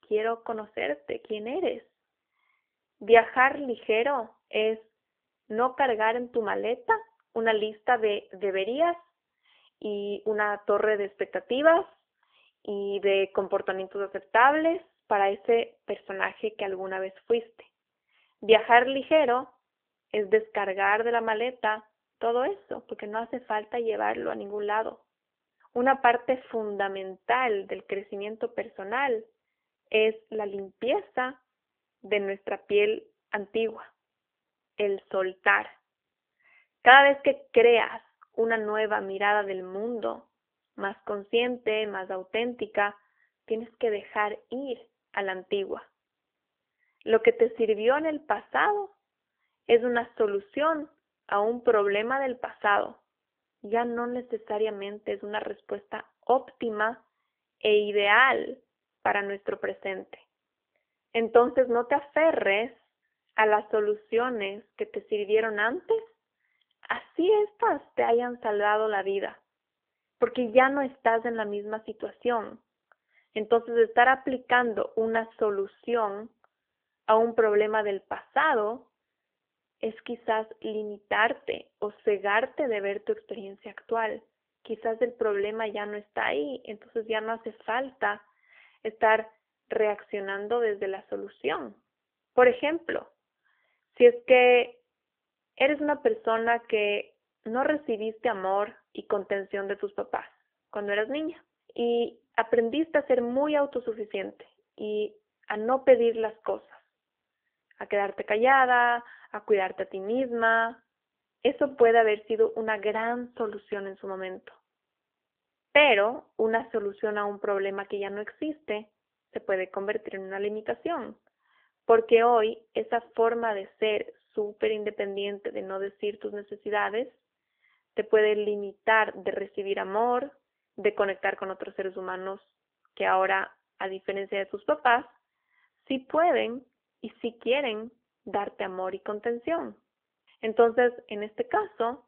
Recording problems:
phone-call audio; nothing above 3 kHz

